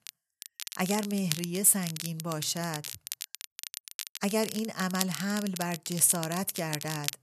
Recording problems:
crackle, like an old record; loud; 9 dB below the speech

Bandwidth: 13.5 kHz